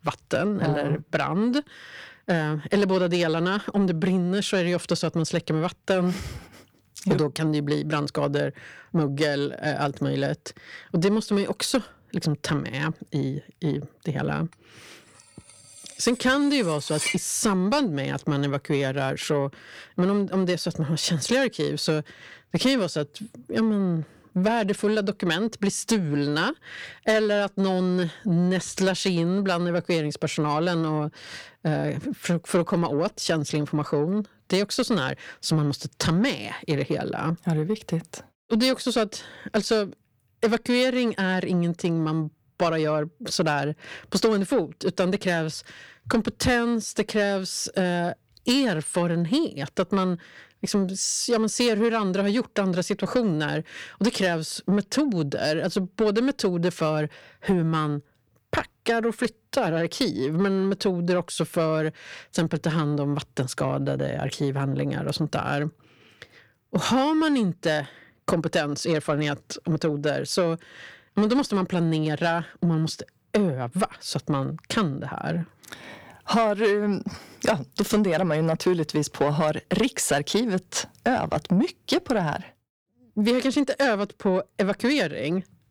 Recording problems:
distortion; slight; 10 dB below the speech
clattering dishes; noticeable; at 17 s; peak 2 dB below the speech

